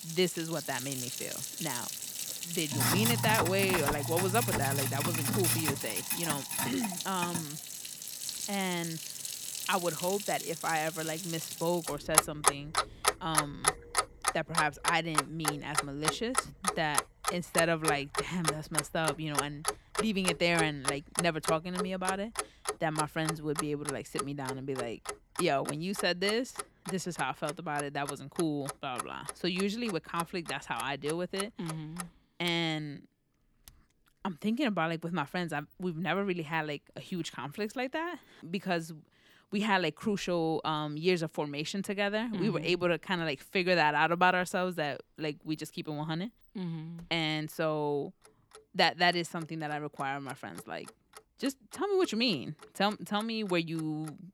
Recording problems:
household noises; loud; throughout; 1 dB below the speech

